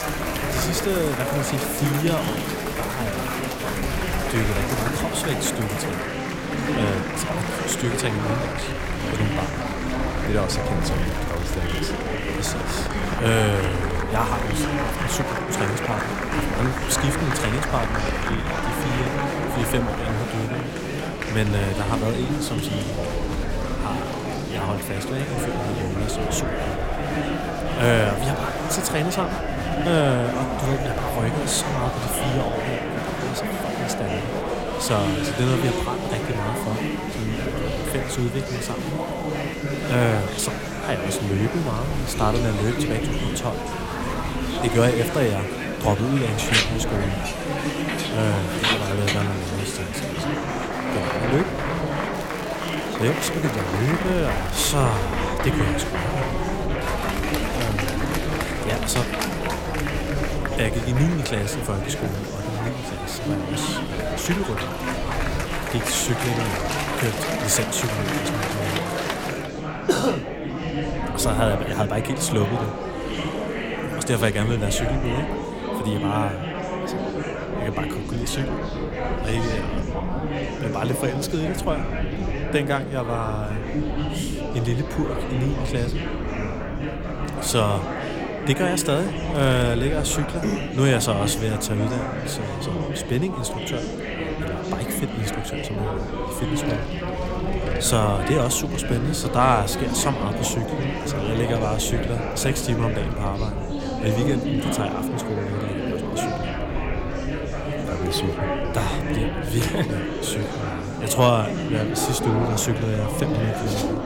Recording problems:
murmuring crowd; loud; throughout; 1 dB below the speech
crackling; noticeable; from 11 to 12 s, from 52 to 55 s and at 1:29; 15 dB below the speech
traffic noise; faint; throughout; 20 dB below the speech
low rumble; faint; throughout; 25 dB below the speech

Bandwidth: 16.5 kHz